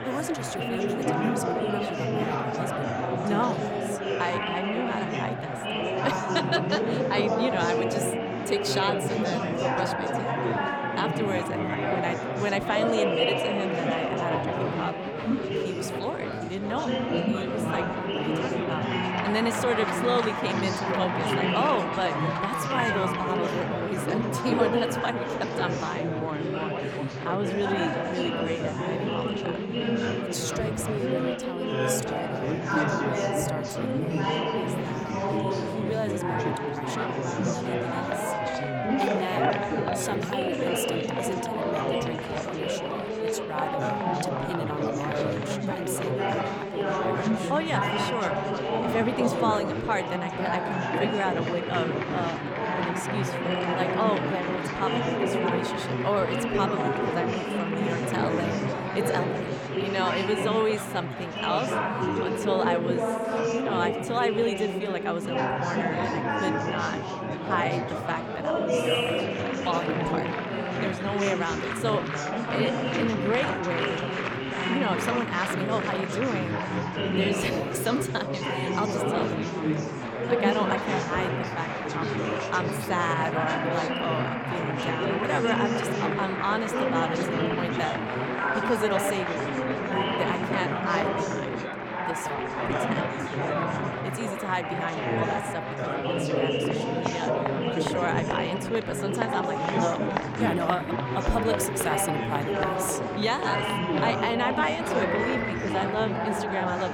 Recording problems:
chatter from many people; very loud; throughout; 3 dB above the speech

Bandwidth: 18.5 kHz